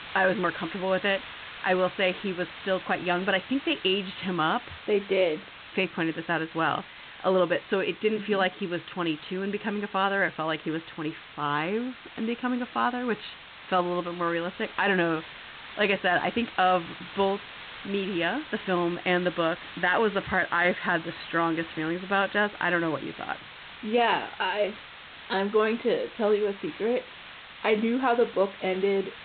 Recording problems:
high frequencies cut off; severe; nothing above 4 kHz
hiss; noticeable; throughout; 15 dB below the speech

